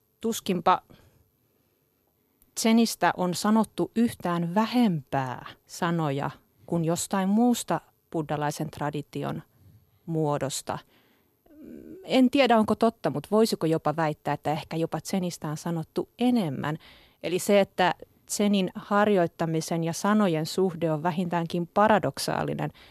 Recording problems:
none

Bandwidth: 14 kHz